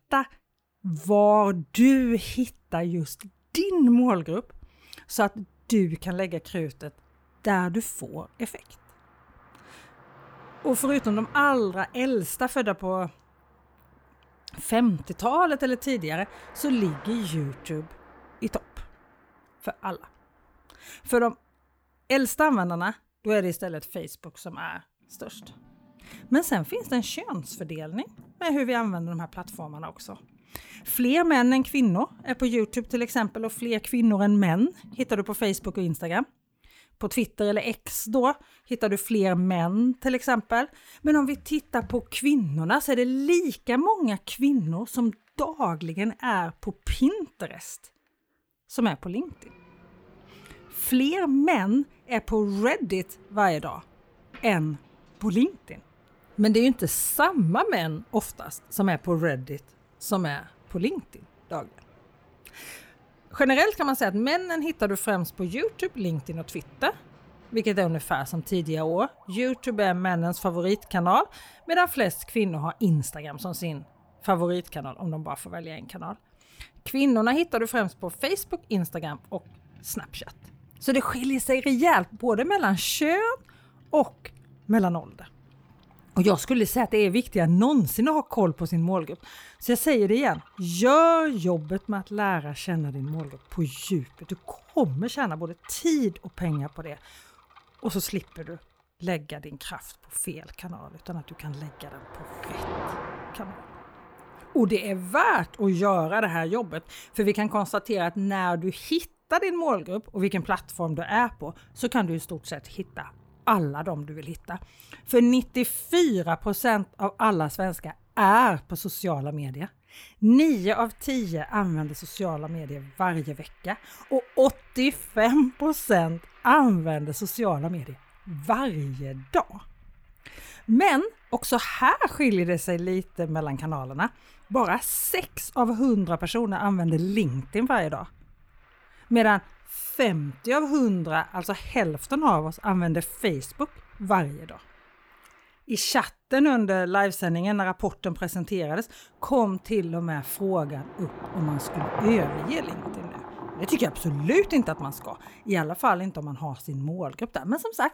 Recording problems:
traffic noise; faint; throughout; 20 dB below the speech

